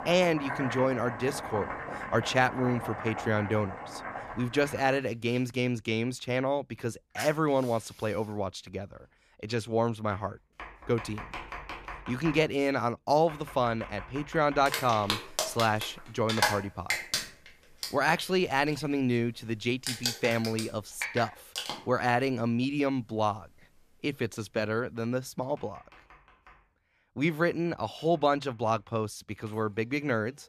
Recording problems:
household noises; loud; throughout; 7 dB below the speech

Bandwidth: 14.5 kHz